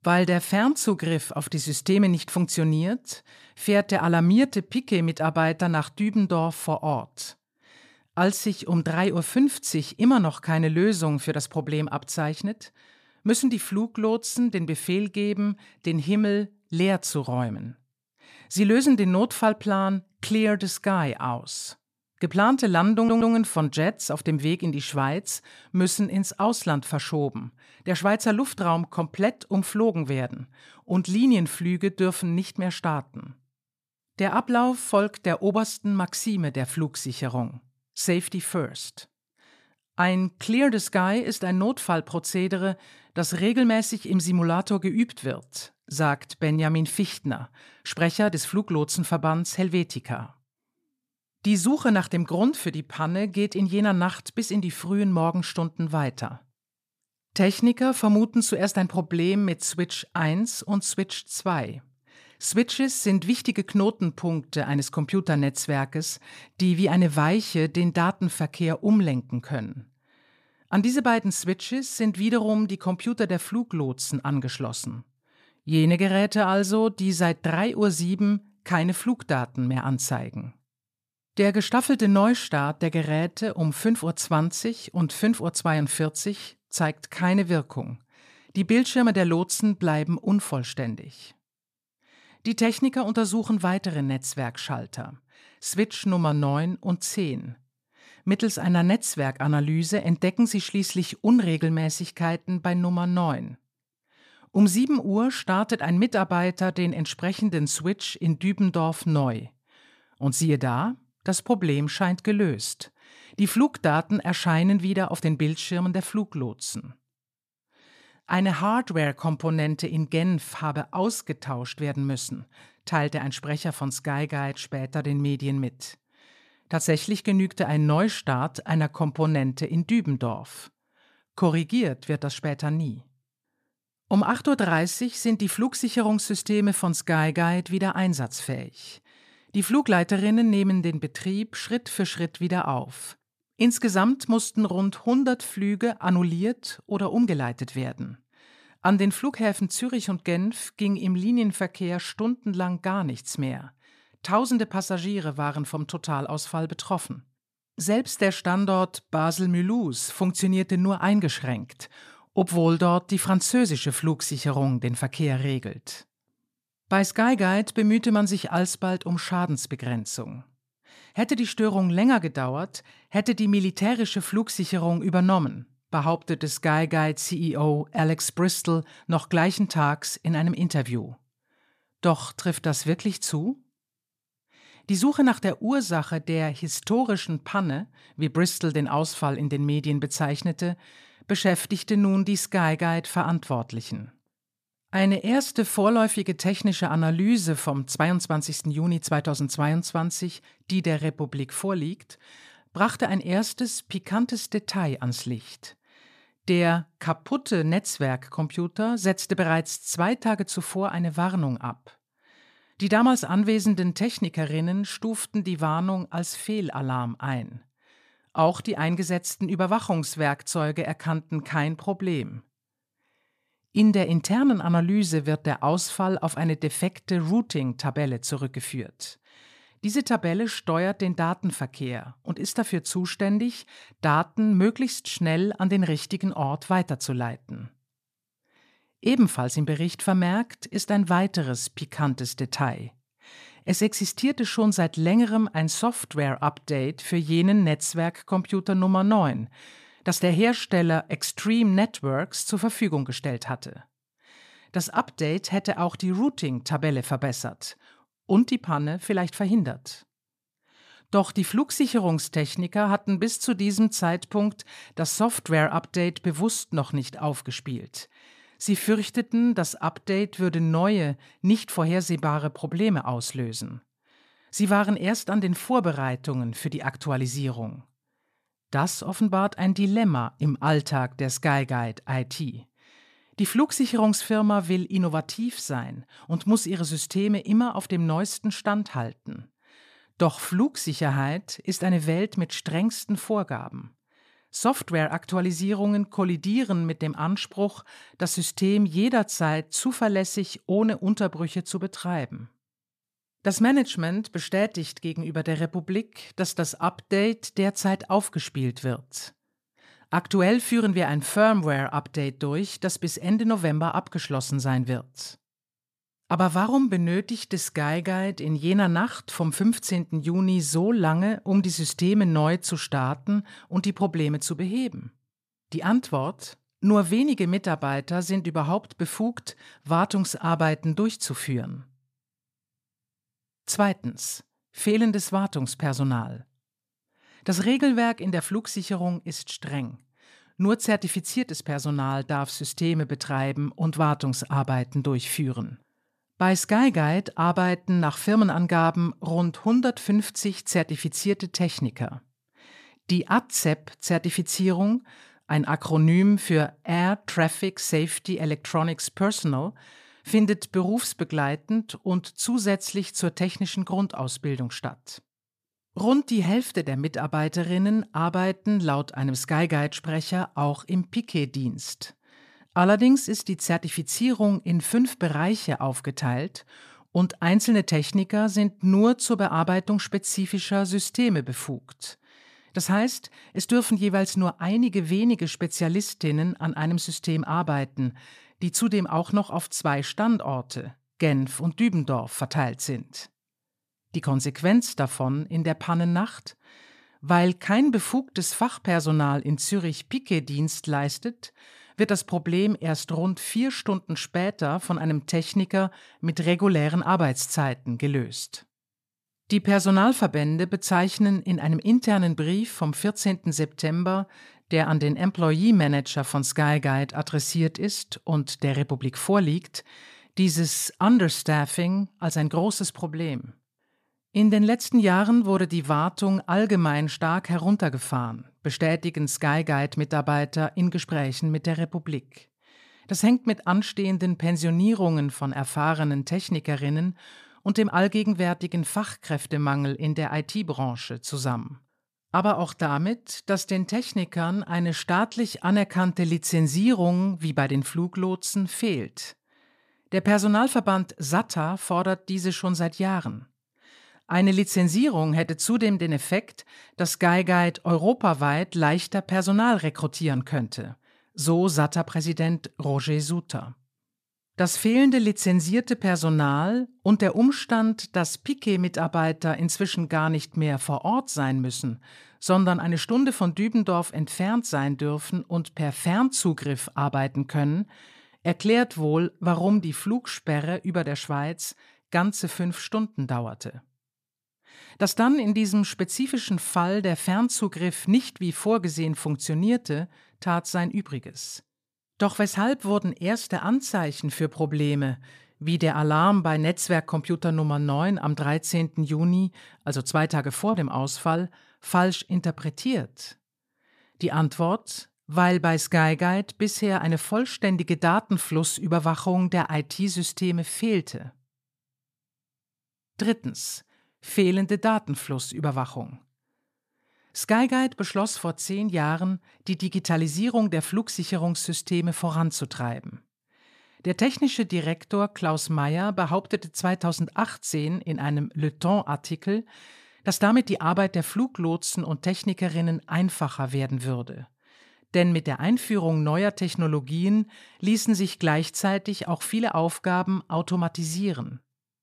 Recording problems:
audio stuttering; at 23 s

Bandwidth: 14.5 kHz